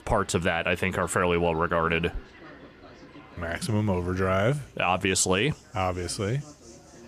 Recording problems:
animal sounds; faint; throughout; 25 dB below the speech
chatter from many people; faint; throughout; 25 dB below the speech

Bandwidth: 14.5 kHz